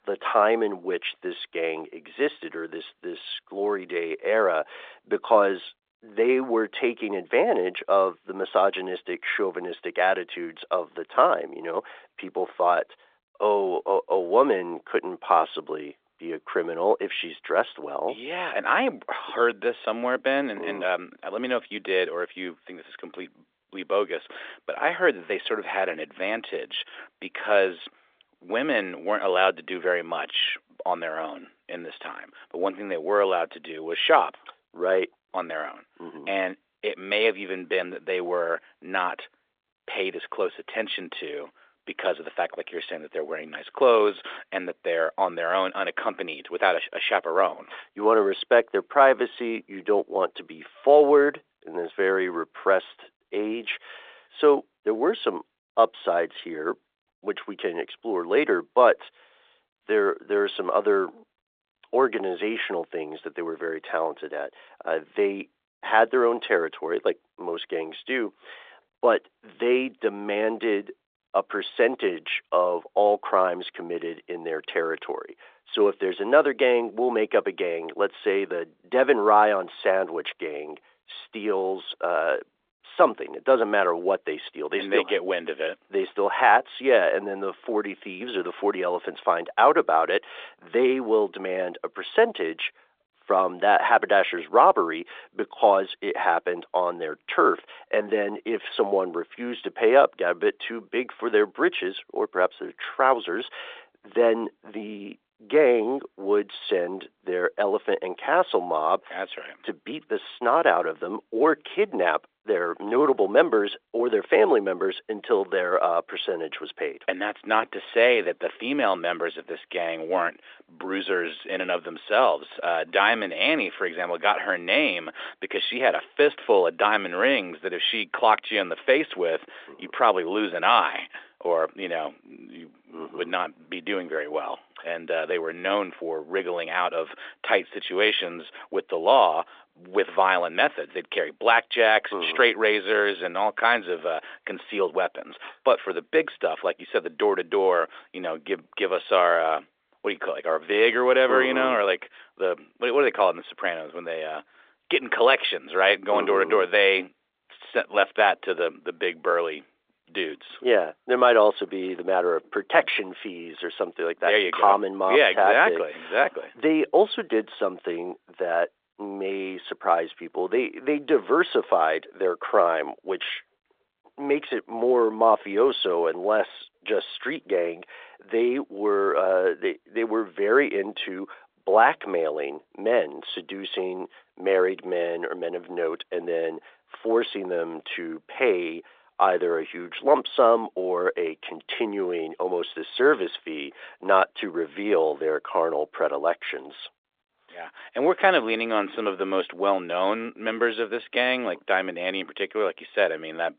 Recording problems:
phone-call audio

